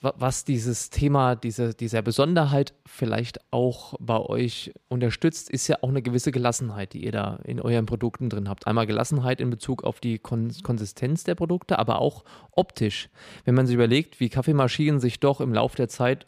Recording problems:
none

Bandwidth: 14.5 kHz